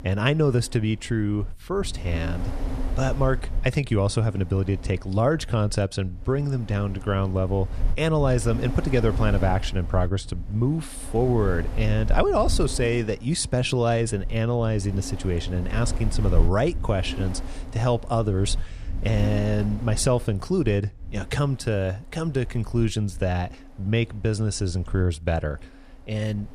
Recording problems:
wind noise on the microphone; occasional gusts; 15 dB below the speech

